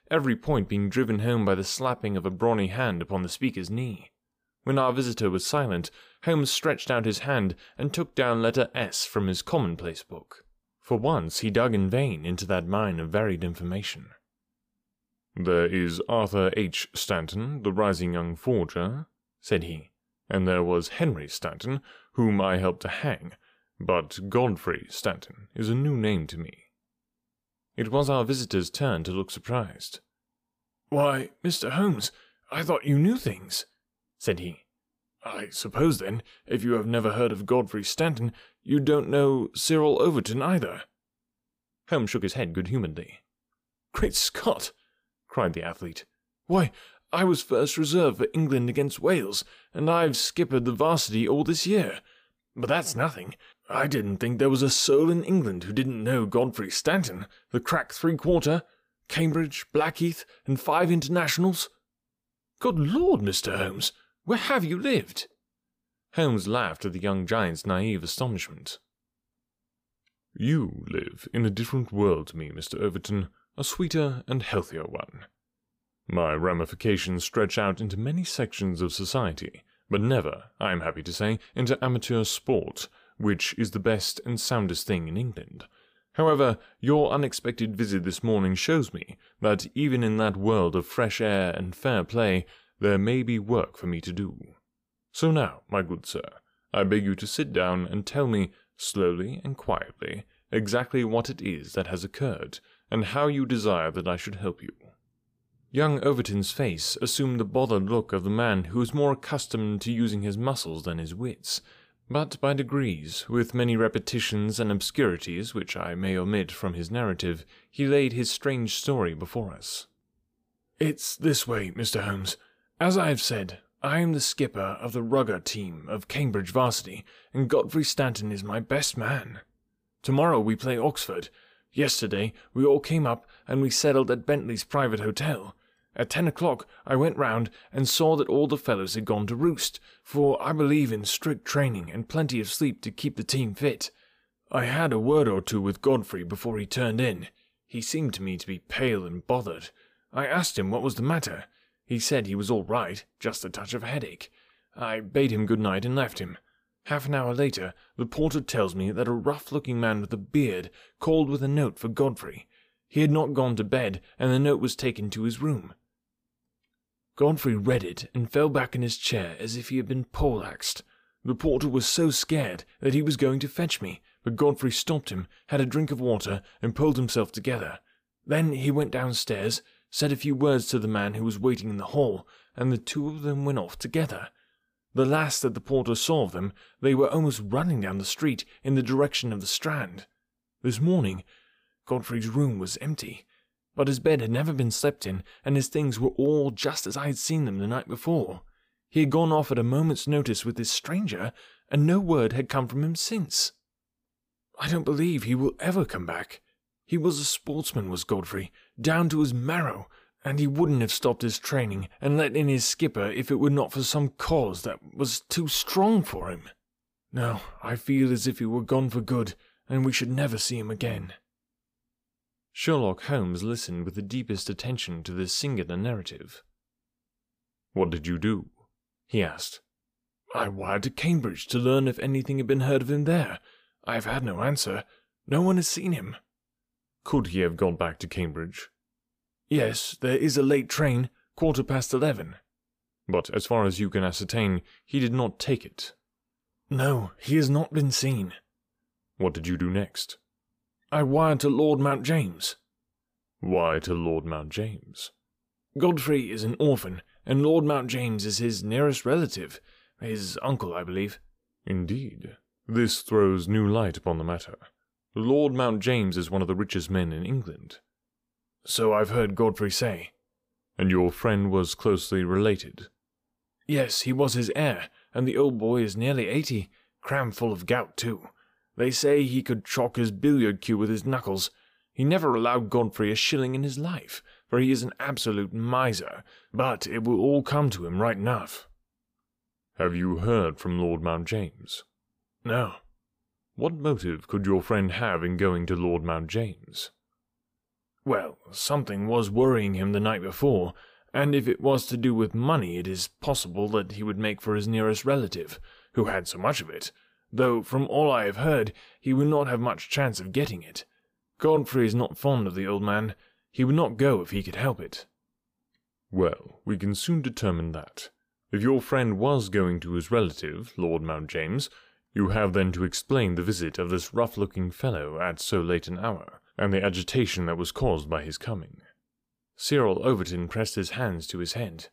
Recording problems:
uneven, jittery; strongly; from 1.5 s to 5:12

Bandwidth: 15 kHz